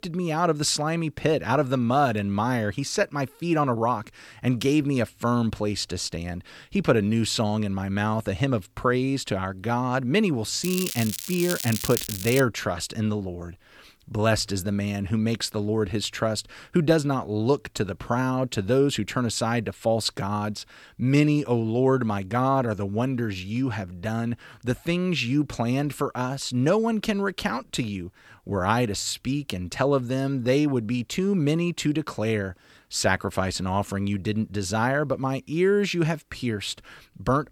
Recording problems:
crackling; loud; from 11 to 12 s; 6 dB below the speech

